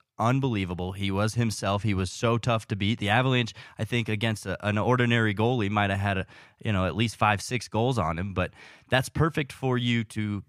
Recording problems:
none

